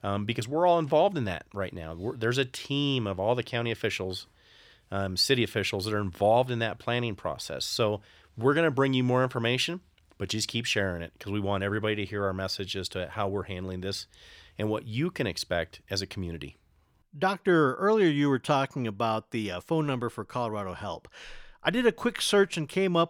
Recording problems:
none

